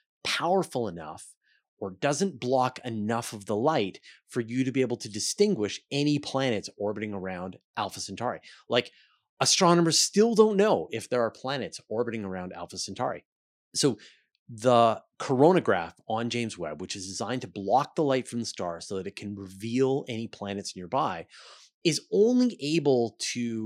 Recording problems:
abrupt cut into speech; at the end

